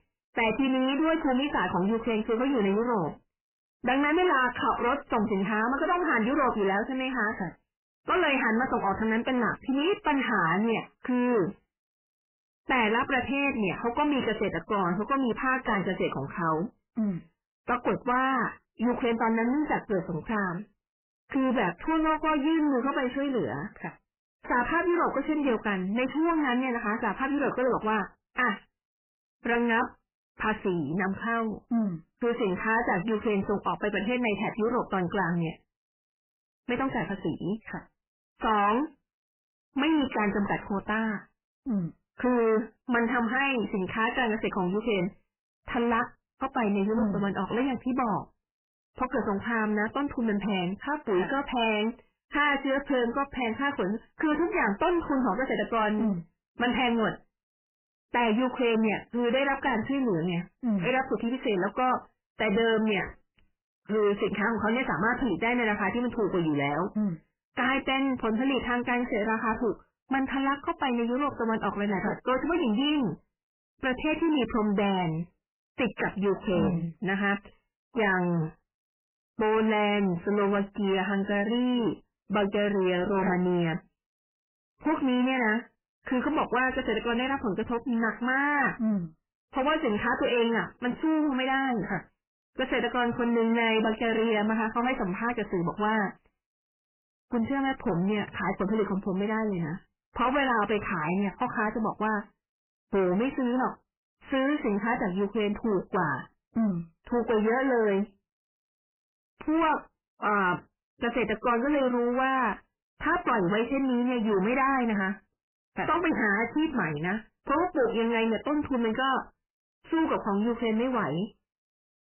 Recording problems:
distortion; heavy; 6 dB below the speech
garbled, watery; badly; nothing above 3 kHz

